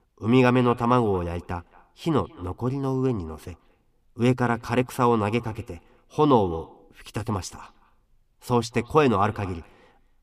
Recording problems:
echo of what is said; faint; throughout; 220 ms later, 25 dB below the speech

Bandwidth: 15 kHz